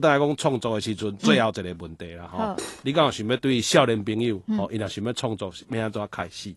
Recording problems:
garbled, watery; slightly; nothing above 11.5 kHz
abrupt cut into speech; at the start
clattering dishes; faint; at 2.5 s; peak 10 dB below the speech

